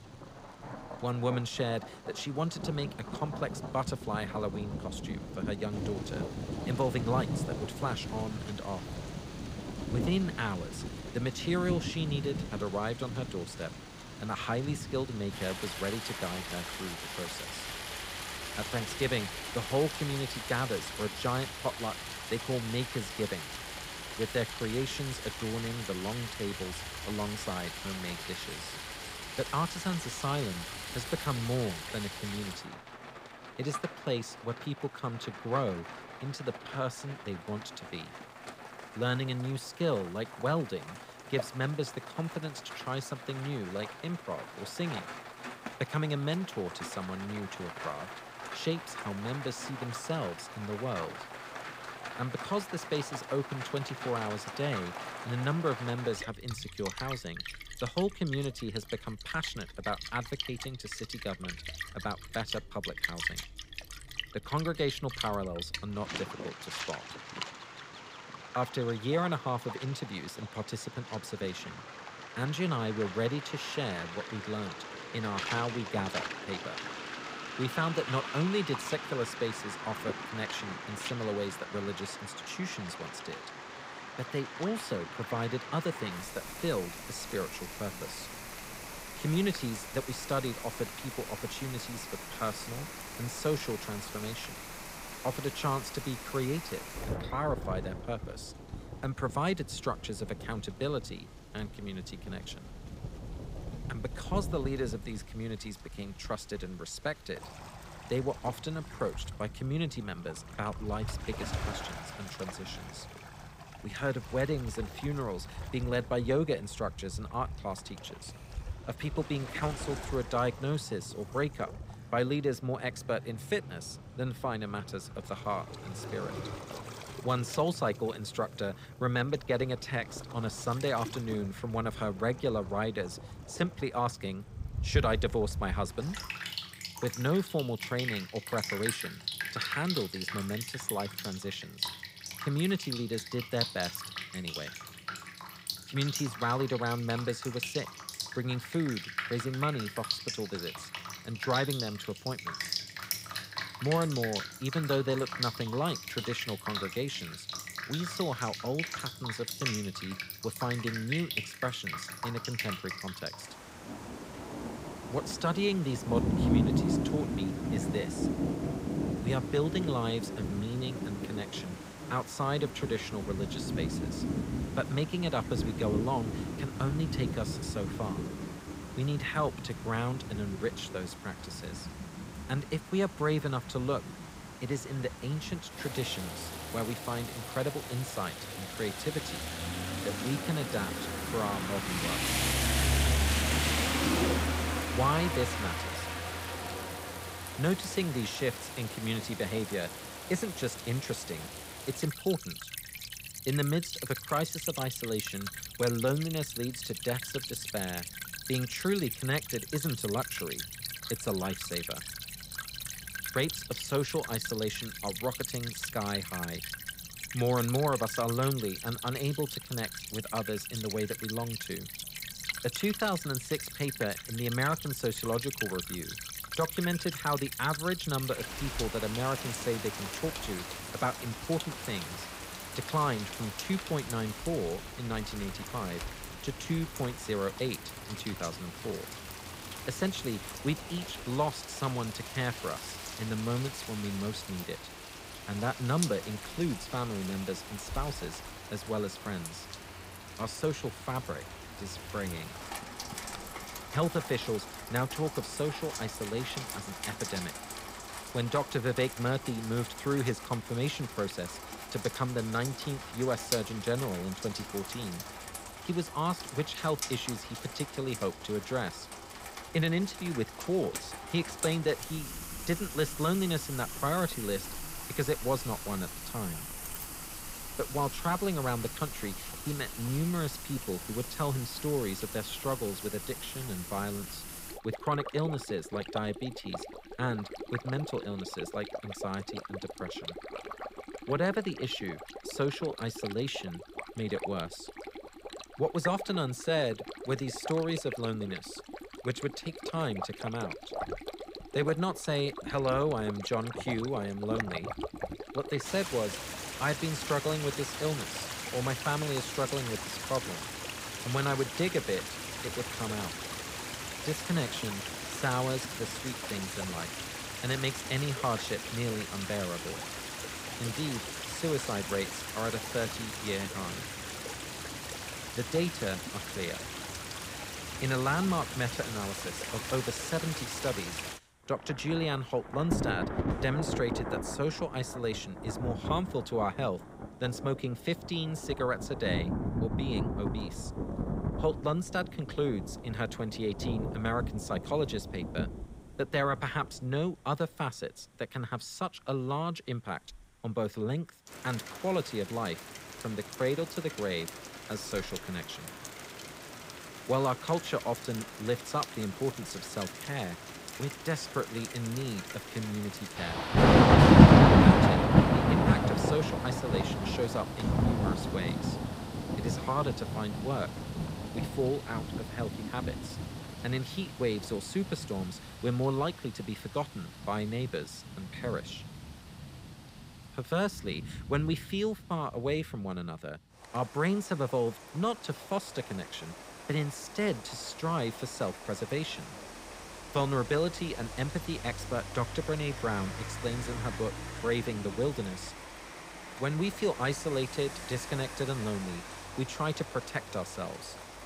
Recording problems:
rain or running water; loud; throughout; 2 dB below the speech

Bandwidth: 15.5 kHz